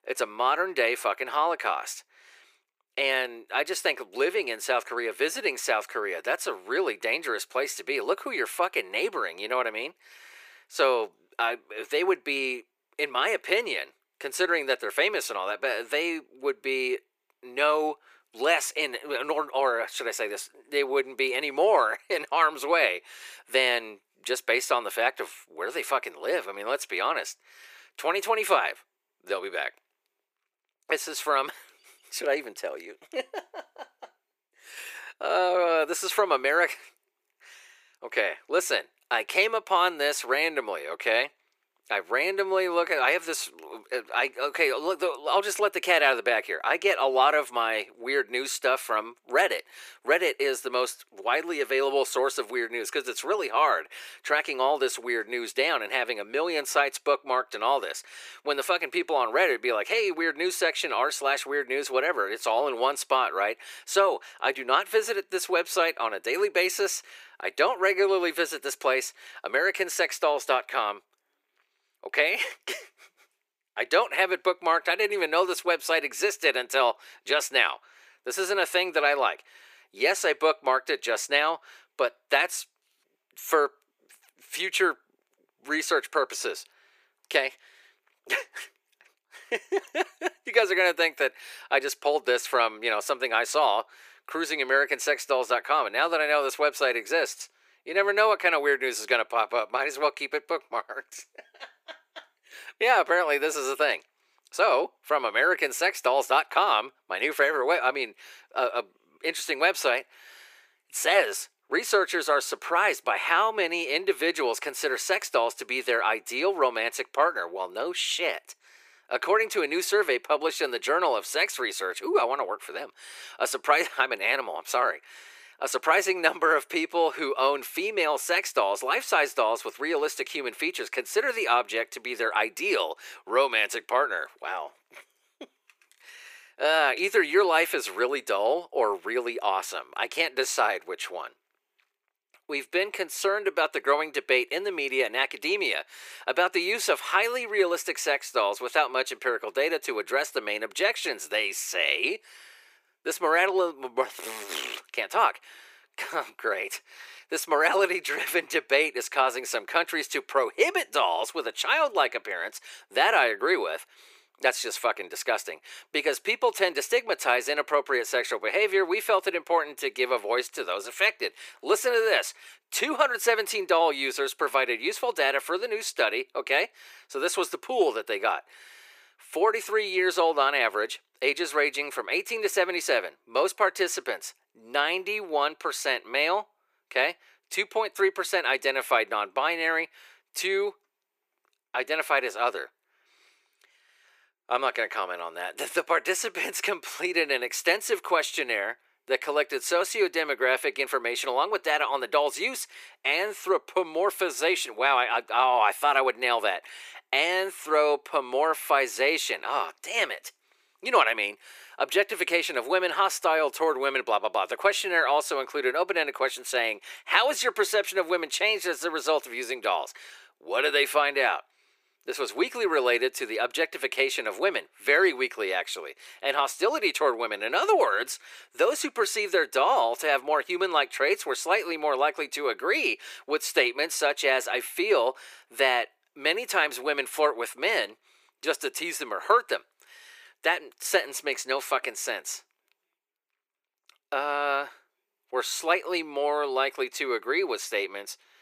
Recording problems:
thin; very; fading below 400 Hz

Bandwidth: 15 kHz